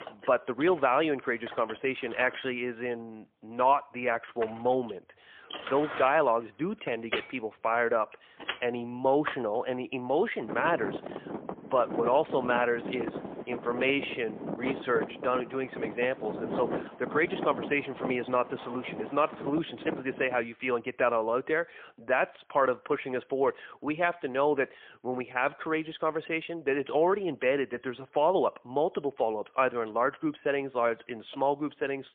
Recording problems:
phone-call audio; poor line
traffic noise; loud; until 20 s; 9 dB below the speech

